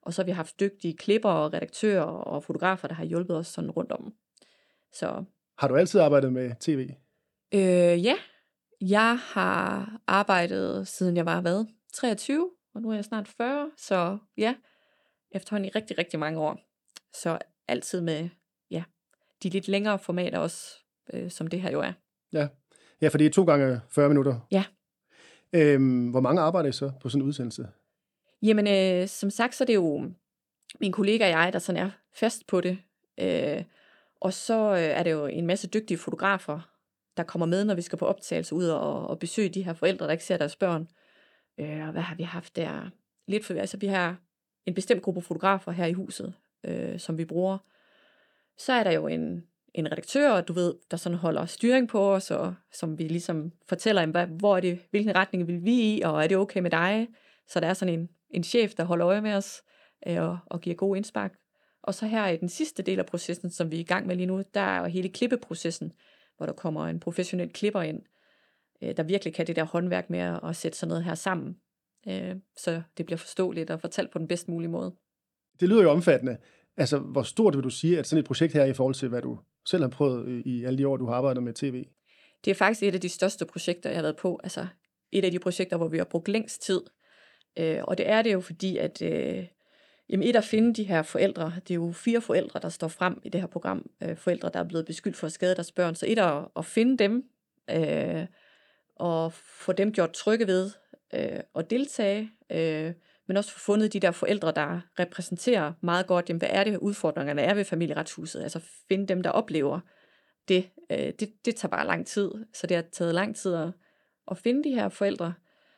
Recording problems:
none

